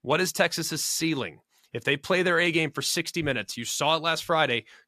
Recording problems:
none

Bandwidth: 14.5 kHz